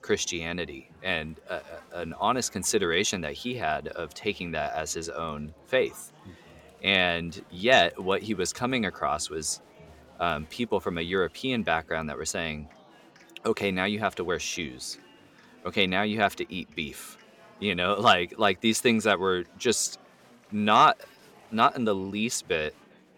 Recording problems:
murmuring crowd; faint; throughout; 25 dB below the speech

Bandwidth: 17 kHz